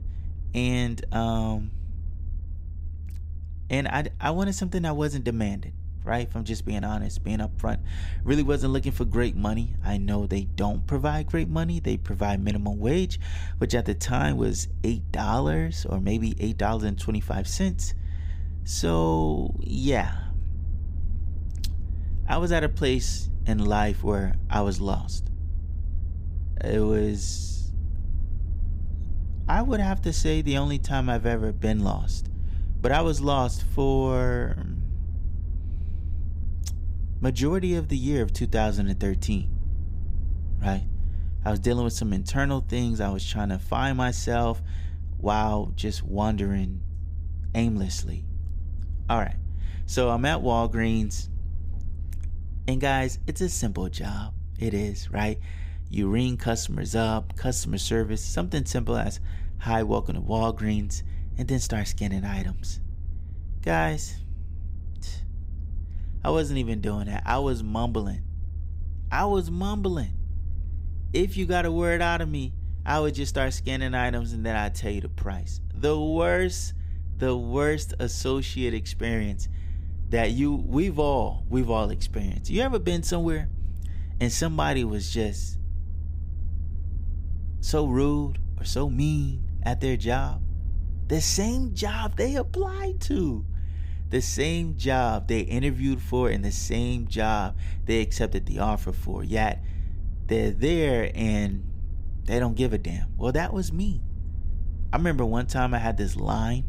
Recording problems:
low rumble; faint; throughout; 20 dB below the speech

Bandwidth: 15.5 kHz